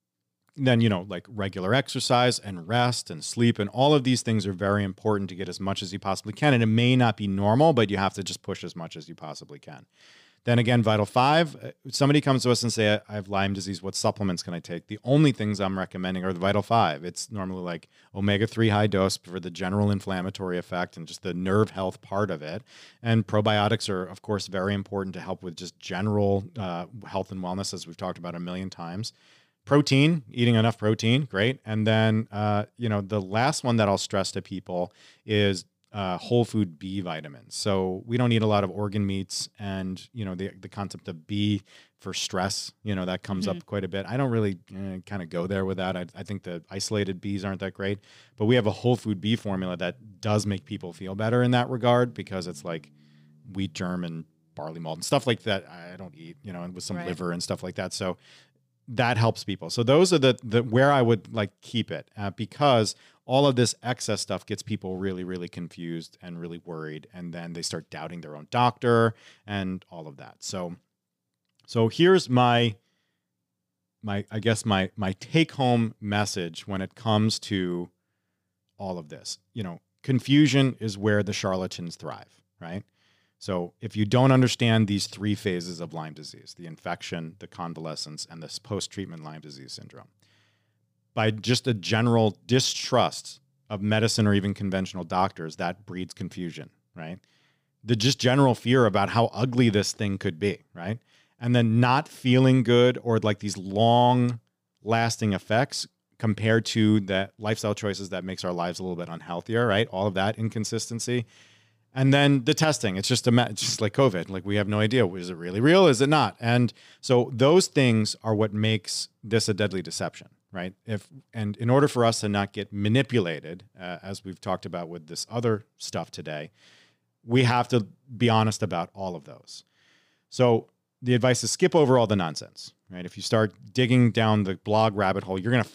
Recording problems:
none

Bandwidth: 15 kHz